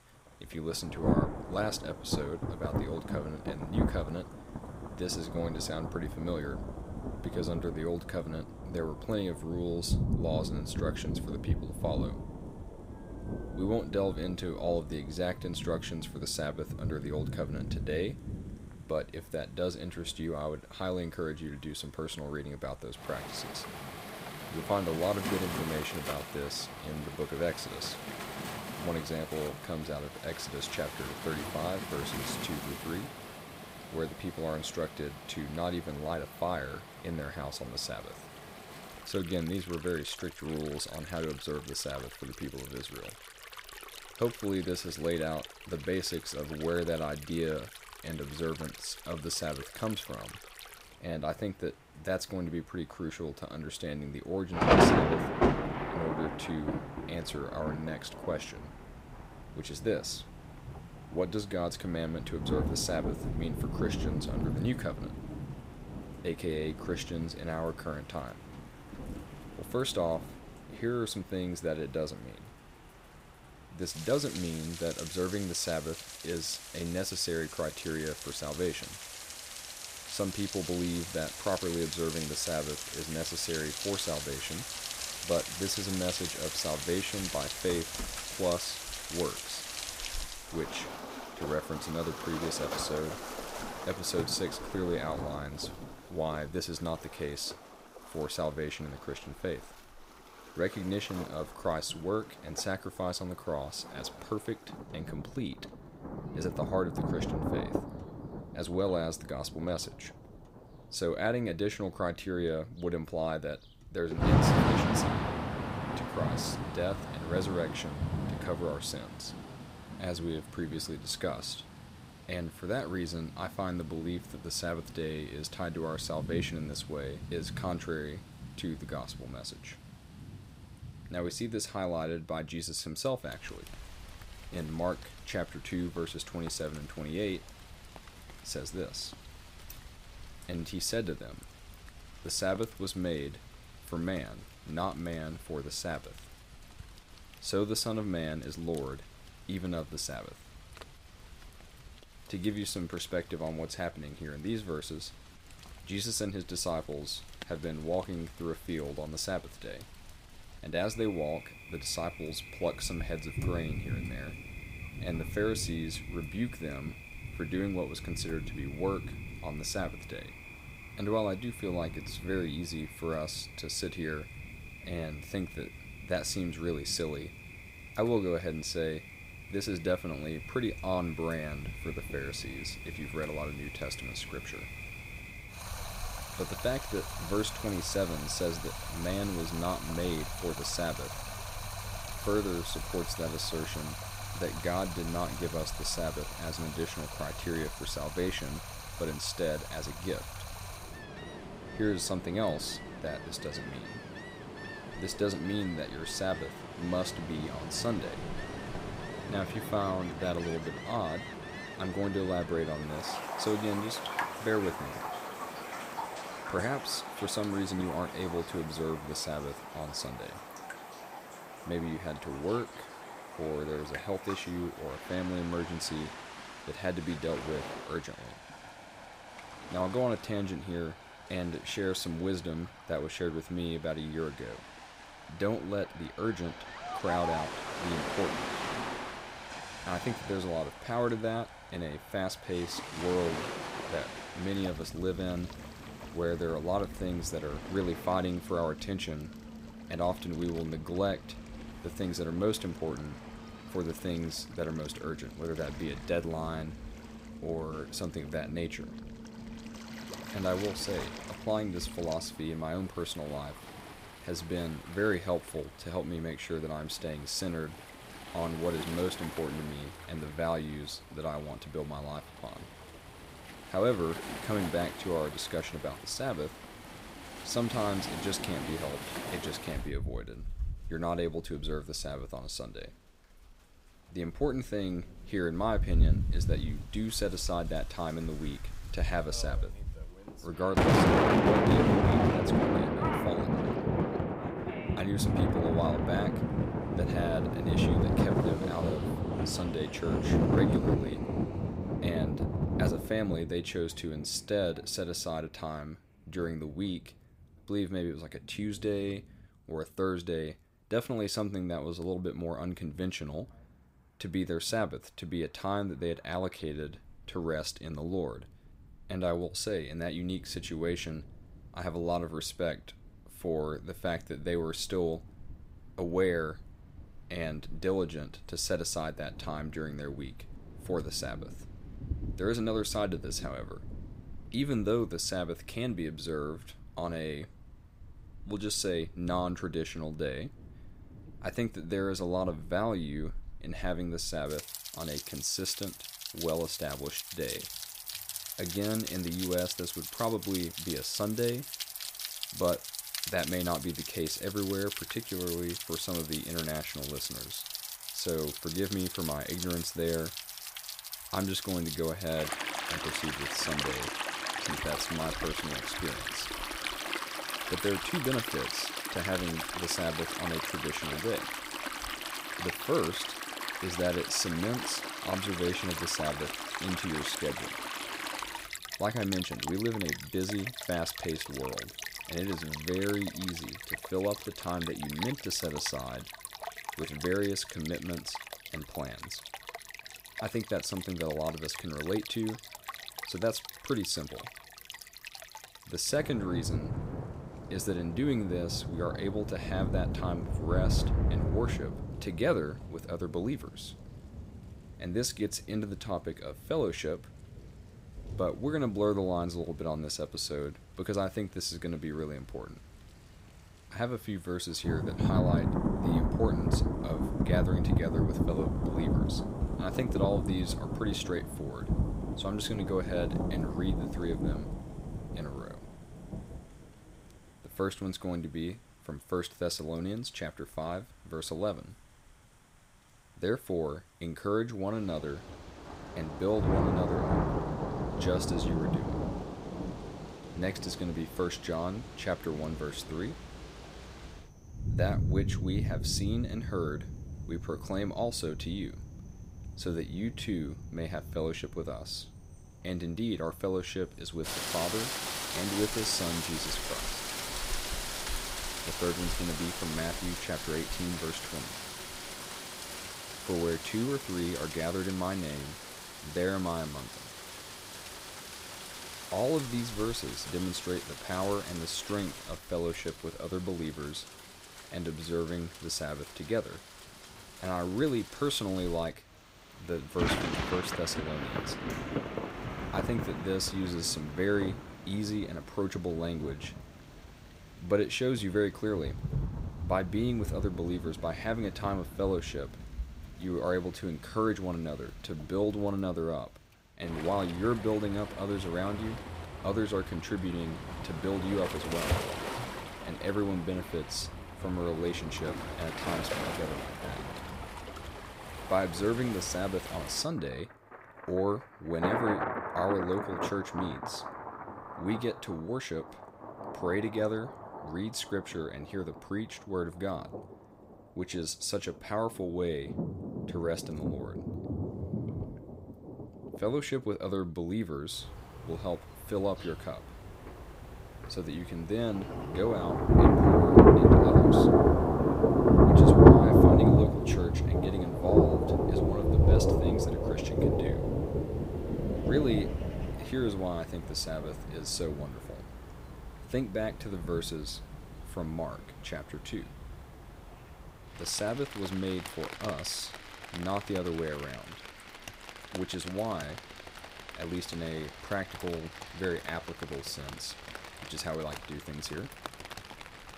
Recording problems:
rain or running water; very loud; throughout; 1 dB above the speech

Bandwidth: 15.5 kHz